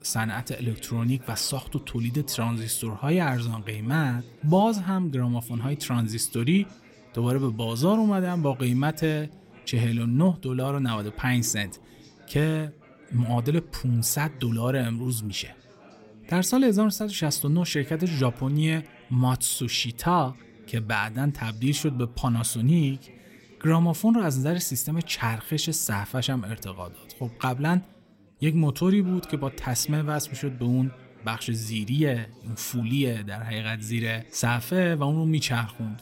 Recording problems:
background chatter; faint; throughout; 4 voices, 25 dB below the speech

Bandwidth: 16 kHz